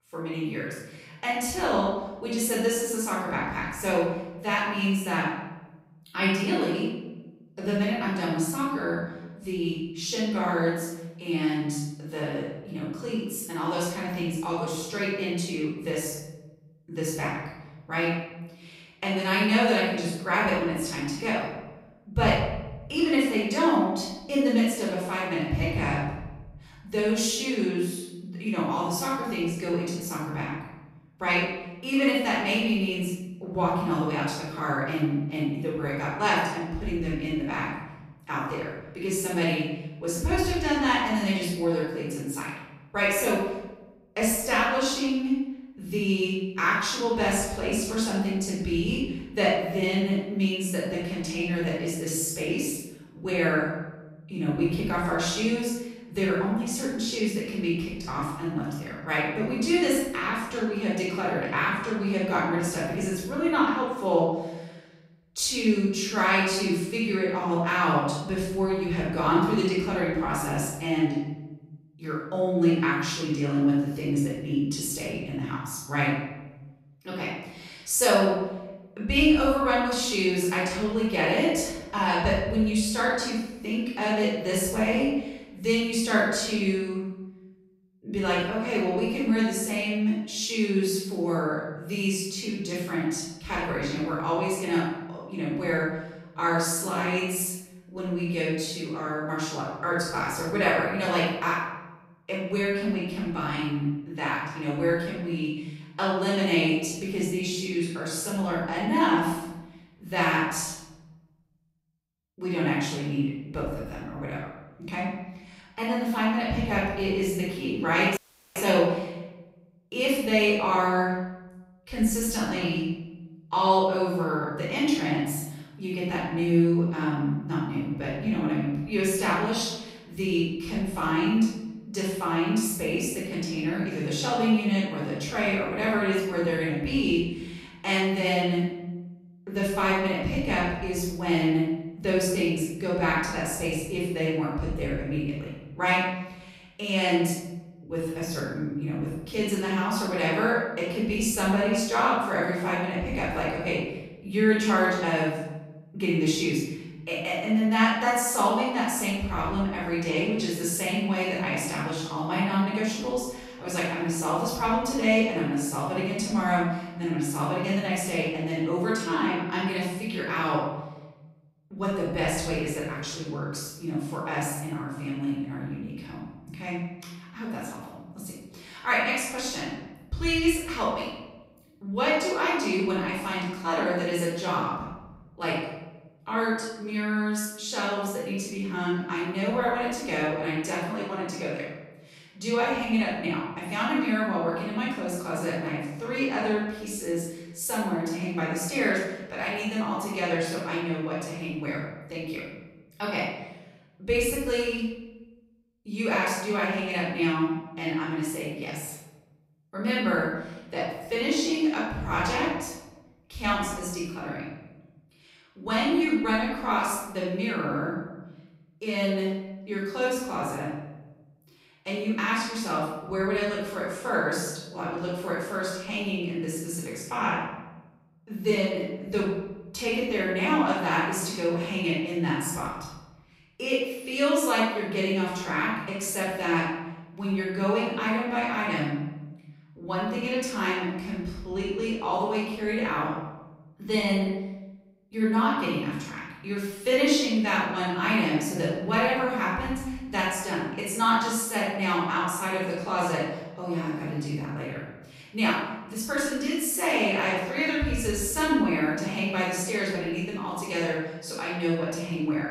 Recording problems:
off-mic speech; far
room echo; noticeable; dies away in 1 s
audio cutting out; at 1:58

